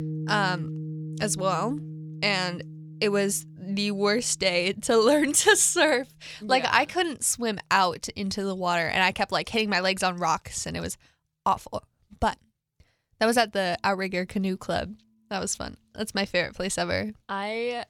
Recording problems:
background music; noticeable; throughout; 15 dB below the speech

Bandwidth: 18.5 kHz